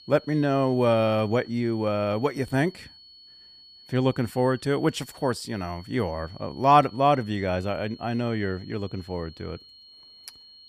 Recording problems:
high-pitched whine; faint; throughout; 4.5 kHz, 20 dB below the speech

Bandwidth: 15 kHz